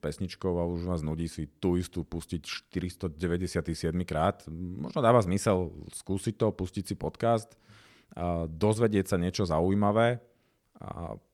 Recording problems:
none

